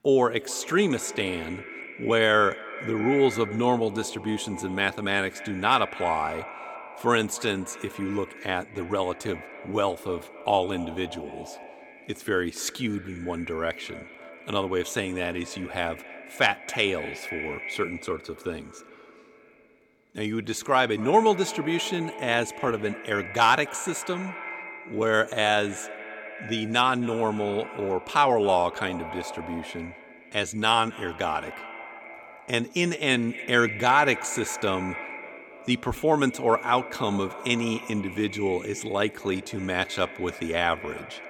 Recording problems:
echo of what is said; noticeable; throughout; 270 ms later, 15 dB below the speech

